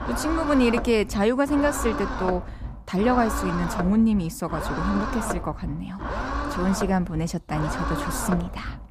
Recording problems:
low rumble; loud; throughout; 3 dB below the speech

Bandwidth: 14.5 kHz